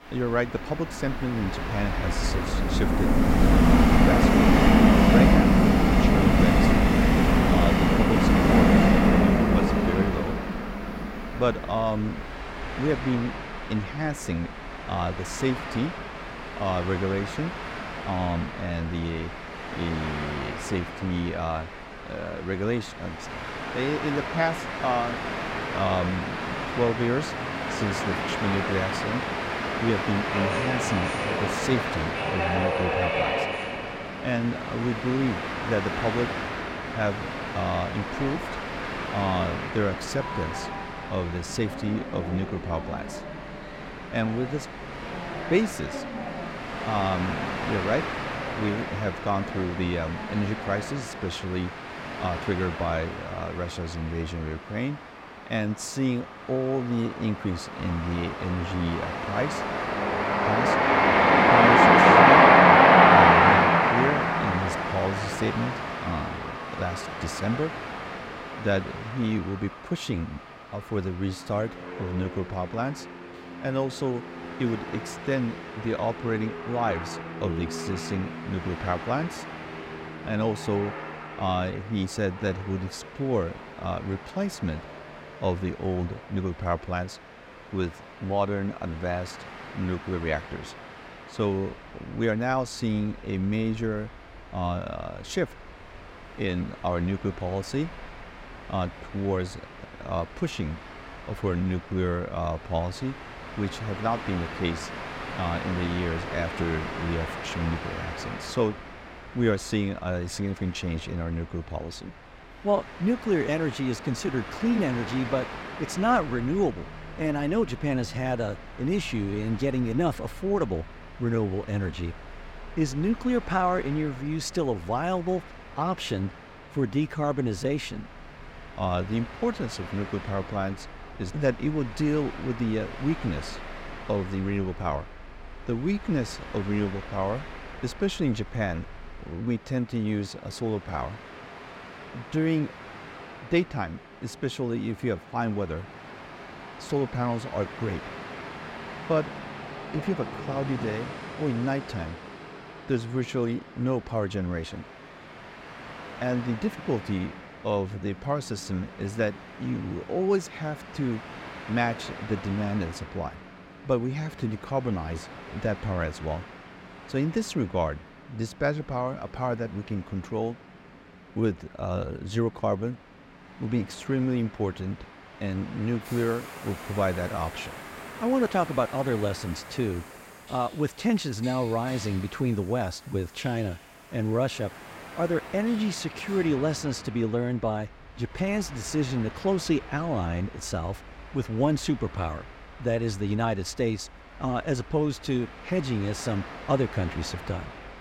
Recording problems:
train or aircraft noise; very loud; throughout; 4 dB above the speech

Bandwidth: 16 kHz